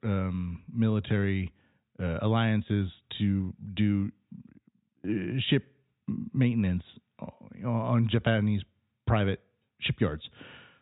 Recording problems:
high frequencies cut off; severe; nothing above 4 kHz

